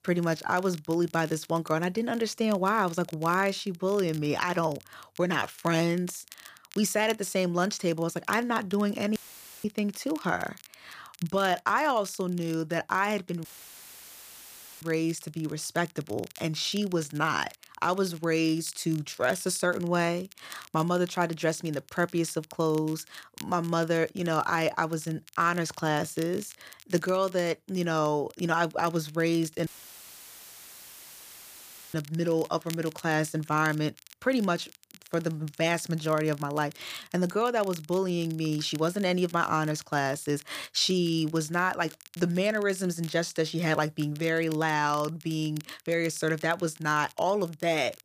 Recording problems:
crackle, like an old record; faint; 20 dB below the speech
audio cutting out; filled with static; at 9 s, at 13 s for 1.5 s and at 30 s for 2.5 s

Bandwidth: 15 kHz